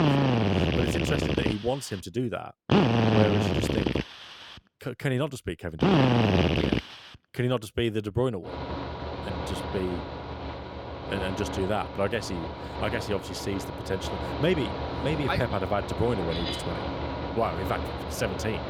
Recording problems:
machinery noise; very loud; throughout; 2 dB above the speech

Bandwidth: 17.5 kHz